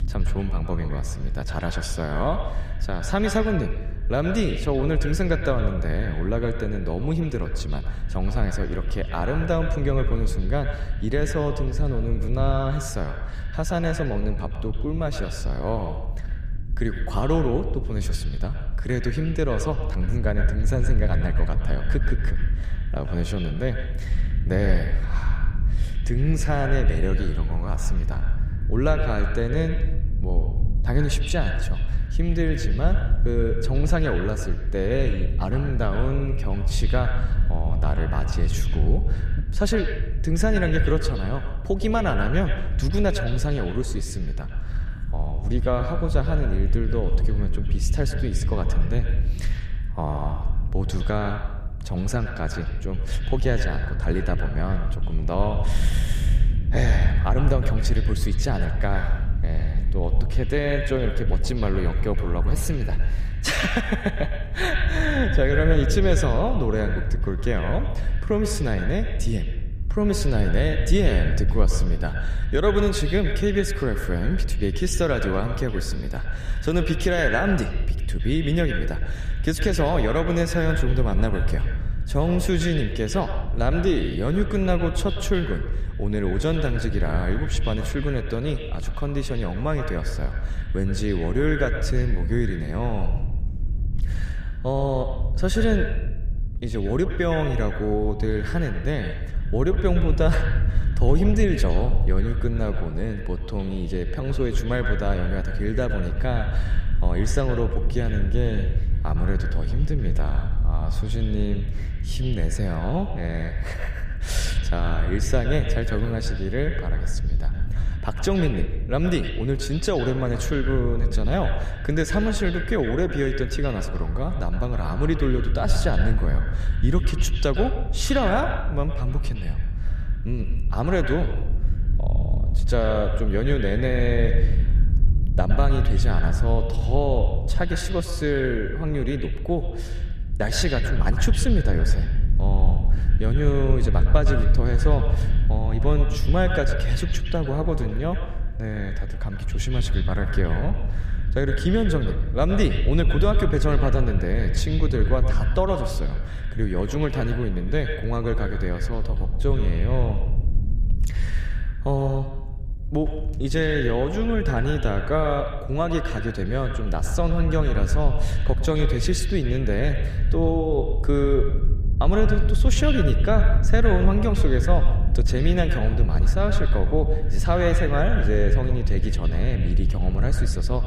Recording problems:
echo of what is said; strong; throughout; 110 ms later, 9 dB below the speech
low rumble; noticeable; throughout; 15 dB below the speech

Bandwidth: 14.5 kHz